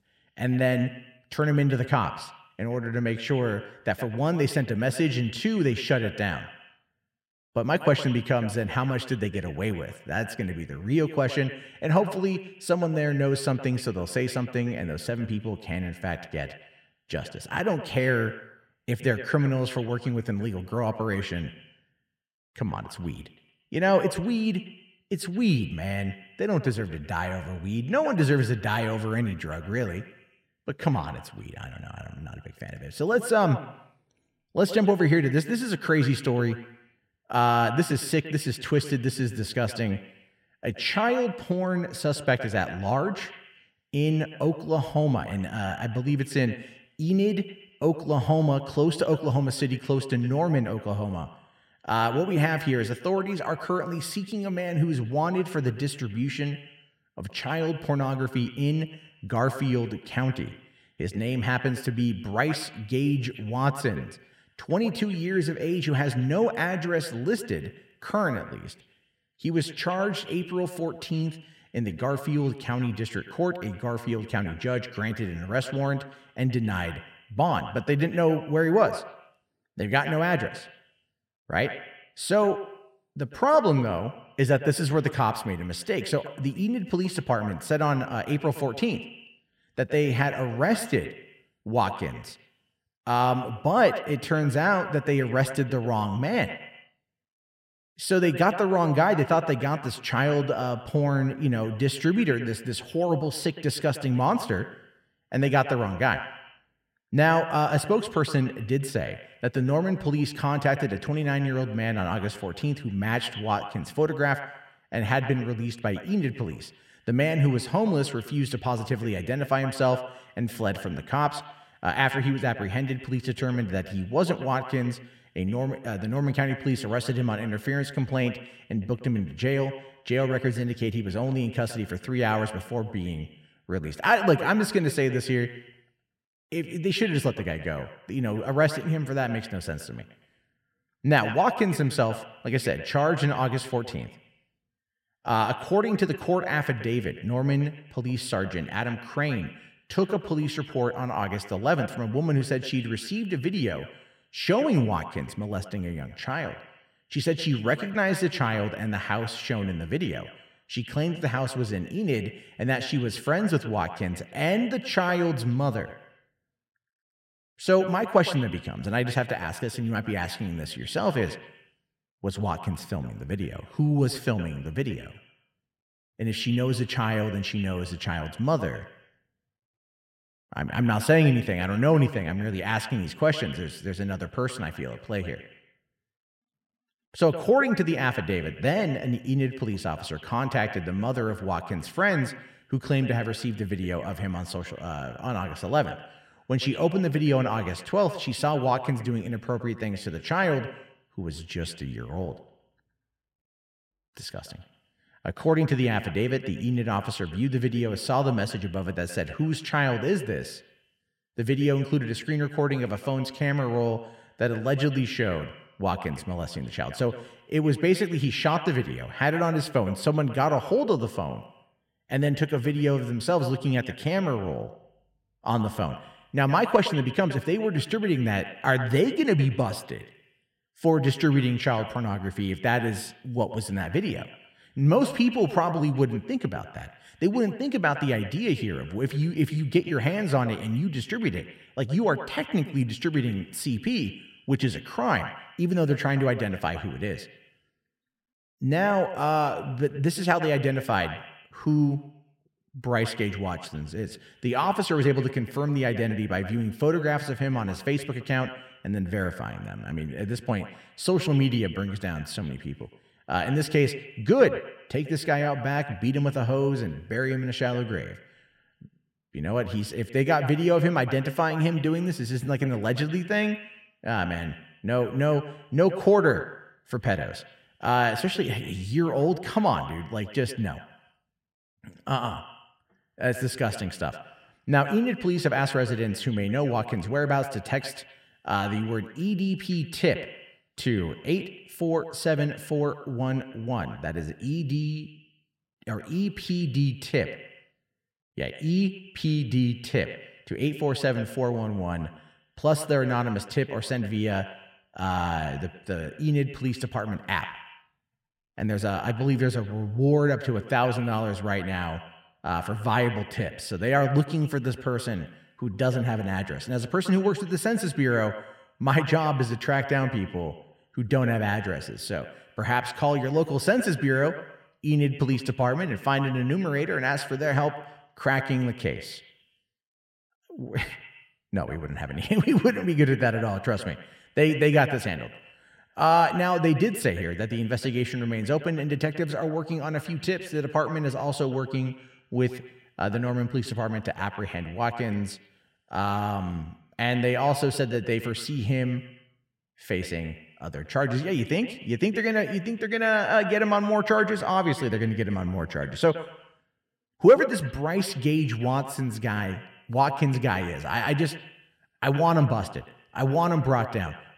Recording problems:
echo of what is said; noticeable; throughout; 110 ms later, 15 dB below the speech

